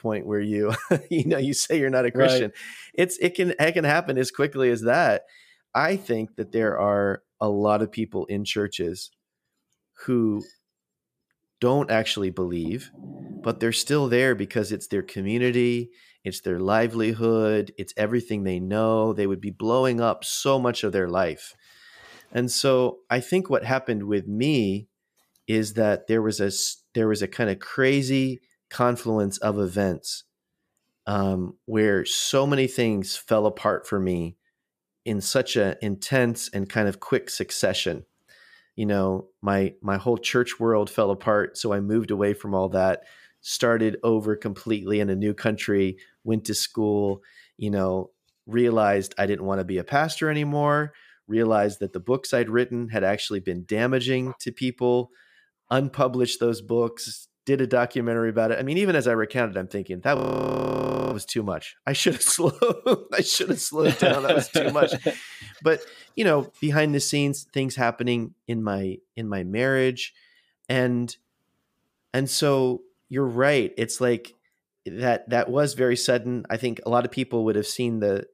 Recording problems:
audio freezing; at 1:00 for 1 s

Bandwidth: 15 kHz